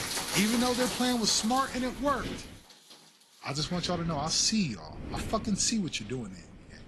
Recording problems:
garbled, watery; slightly; nothing above 11.5 kHz
rain or running water; loud; throughout; 5 dB below the speech
wind noise on the microphone; occasional gusts; until 2.5 s and from 3.5 s on; 20 dB below the speech

